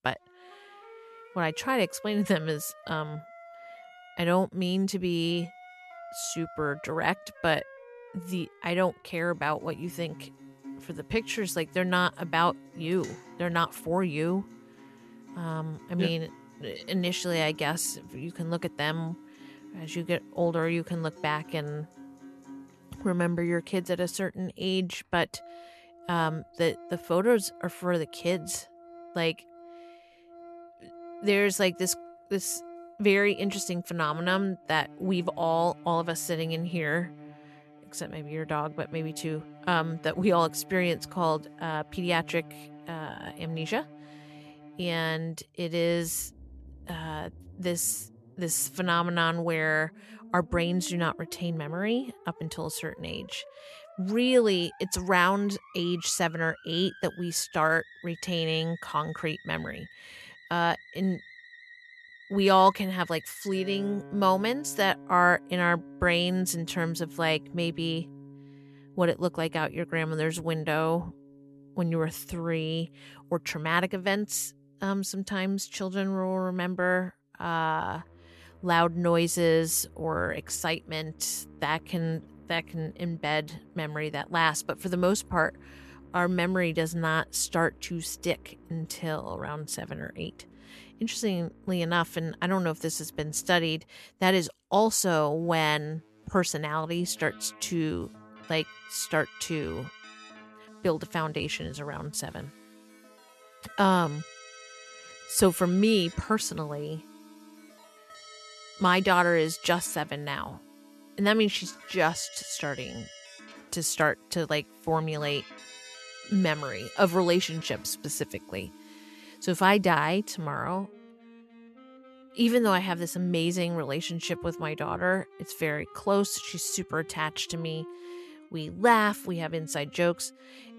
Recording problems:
background music; faint; throughout; 20 dB below the speech

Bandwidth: 13.5 kHz